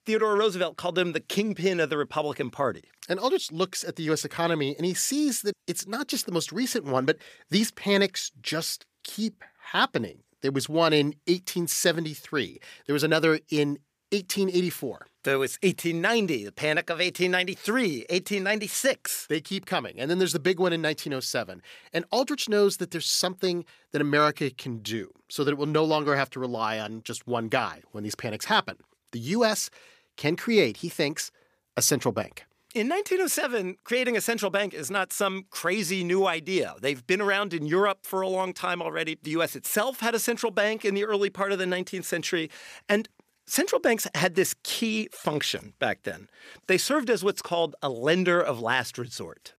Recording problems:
none

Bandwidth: 15 kHz